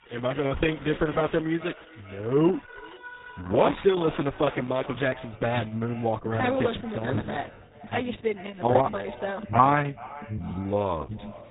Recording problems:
garbled, watery; badly; nothing above 4 kHz
echo of what is said; faint; throughout; 430 ms later, 20 dB below the speech
high frequencies cut off; slight
alarms or sirens; noticeable; throughout; 15 dB below the speech

